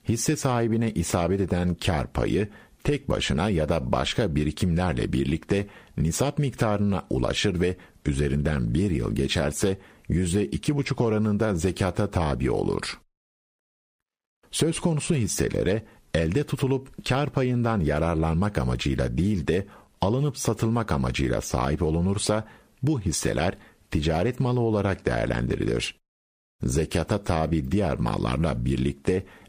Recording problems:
squashed, flat; somewhat

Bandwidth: 15 kHz